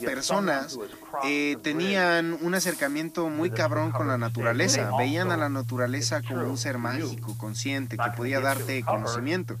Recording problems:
background music; loud; throughout; 7 dB below the speech
voice in the background; loud; throughout; 6 dB below the speech
hiss; noticeable; throughout; 15 dB below the speech

